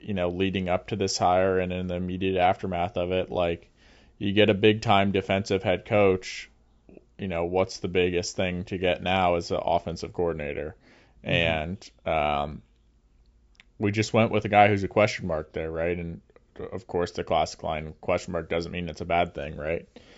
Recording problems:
high frequencies cut off; noticeable; nothing above 8 kHz

